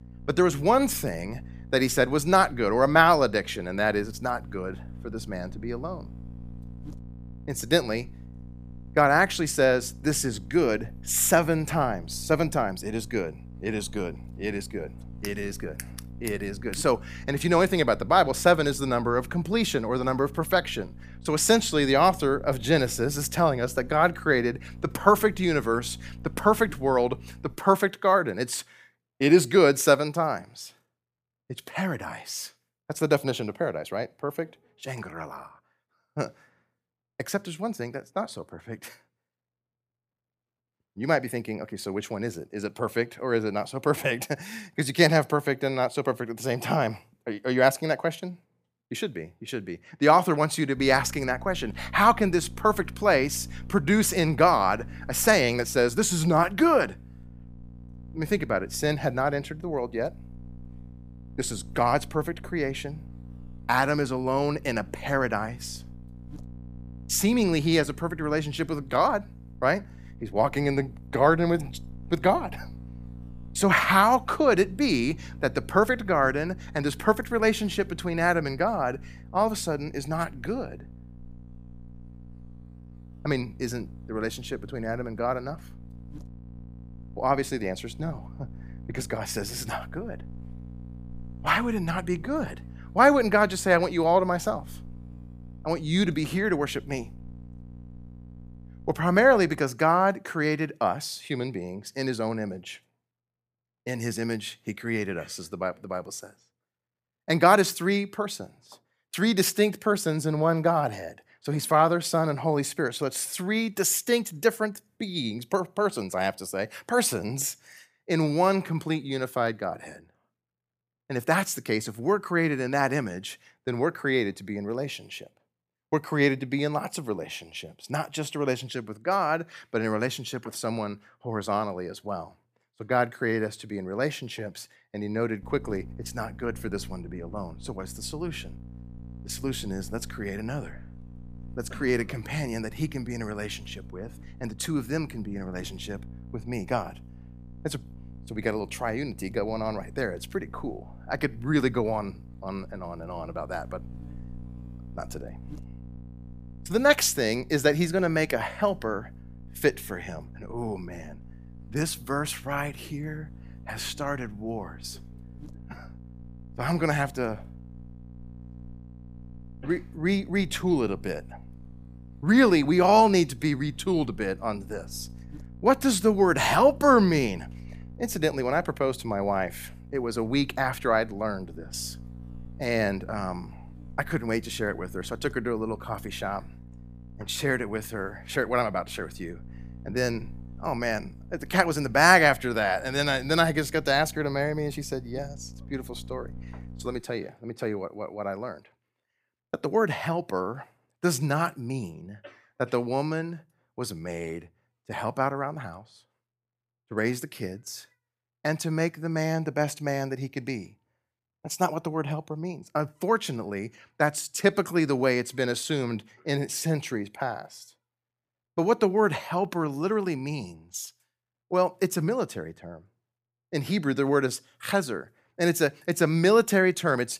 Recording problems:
electrical hum; faint; until 28 s, from 51 s to 1:40 and from 2:15 to 3:17; 60 Hz, 30 dB below the speech

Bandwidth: 15 kHz